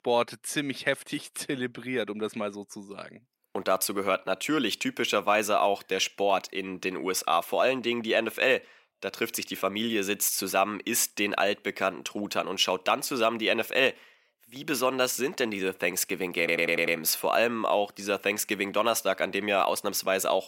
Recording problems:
thin; somewhat; fading below 300 Hz
audio stuttering; at 16 s

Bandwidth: 16 kHz